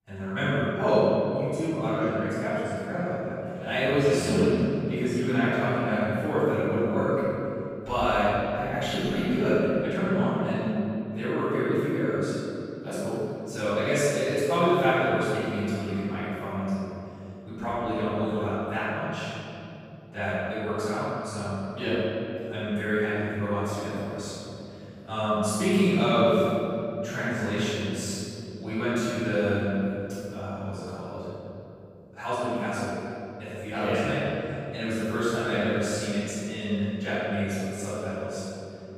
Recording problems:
room echo; strong; dies away in 3 s
off-mic speech; far

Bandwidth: 15 kHz